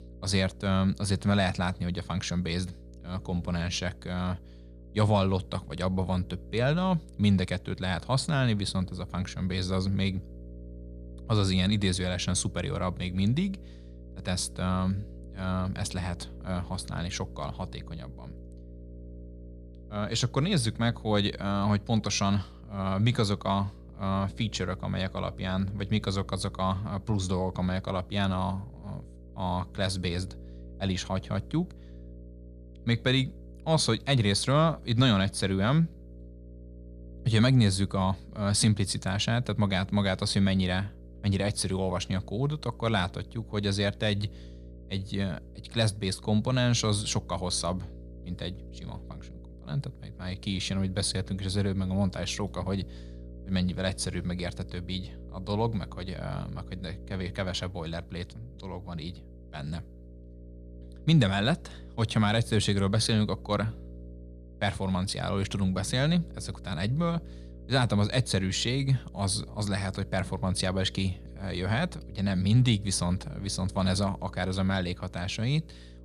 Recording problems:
electrical hum; faint; throughout; 60 Hz, 25 dB below the speech

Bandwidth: 15 kHz